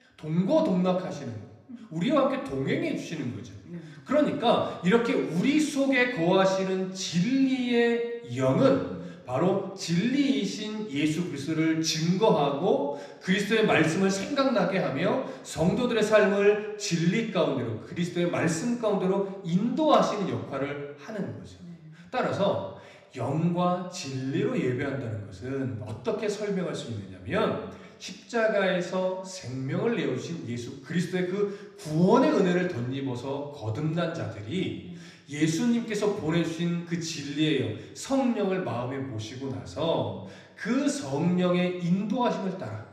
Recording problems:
room echo; slight; dies away in 0.8 s
off-mic speech; somewhat distant

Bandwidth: 14.5 kHz